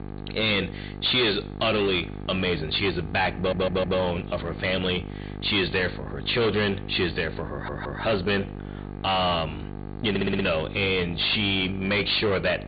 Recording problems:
distortion; heavy; 12% of the sound clipped
high frequencies cut off; severe; nothing above 4.5 kHz
garbled, watery; slightly
electrical hum; noticeable; throughout; 50 Hz, 15 dB below the speech
audio stuttering; at 3.5 s, at 7.5 s and at 10 s

